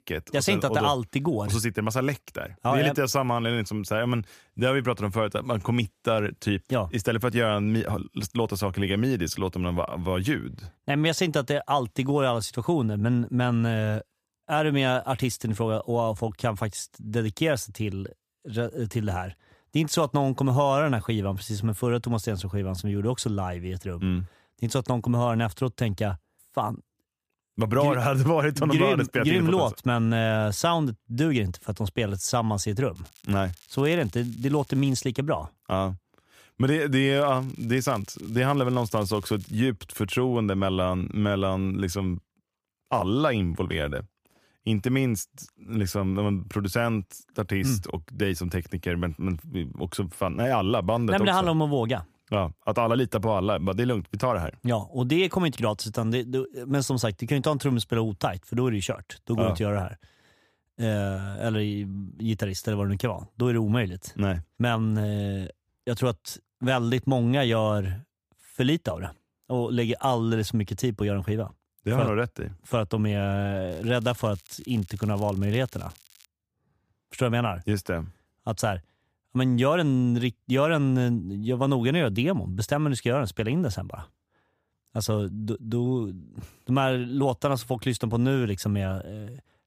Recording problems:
crackling; faint; from 33 to 35 s, from 37 to 40 s and from 1:14 to 1:16; 25 dB below the speech

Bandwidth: 15 kHz